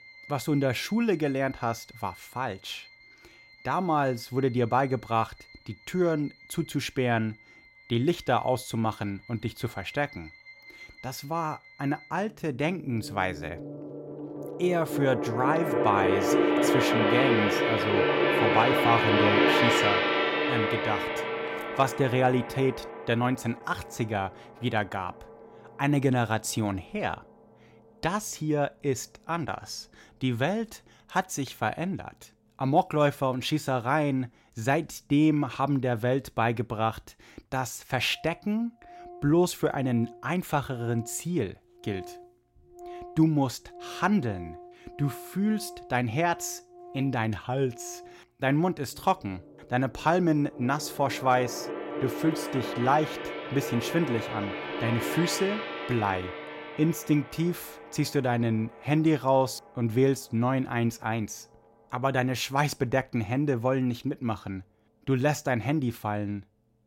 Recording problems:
background music; very loud; throughout; as loud as the speech

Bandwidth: 16 kHz